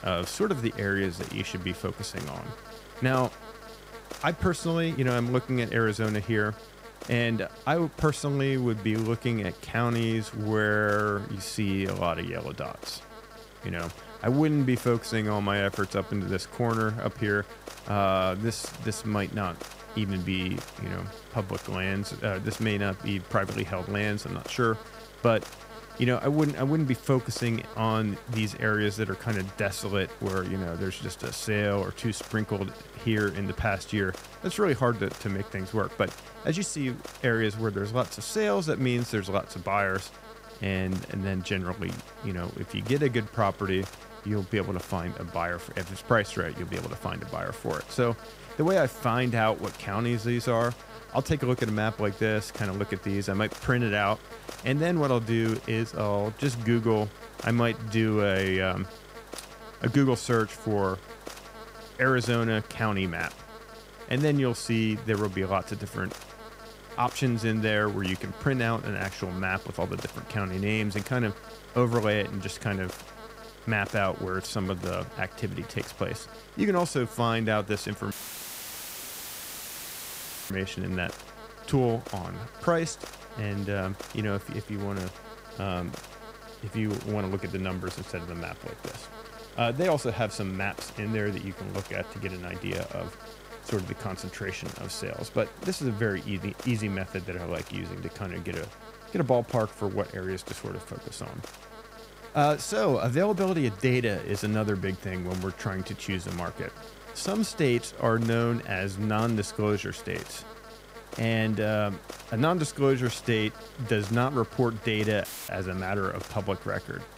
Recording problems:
electrical hum; noticeable; throughout; 50 Hz, 15 dB below the speech
audio cutting out; filled with static; at 1:18 for 2.5 s and at 1:55

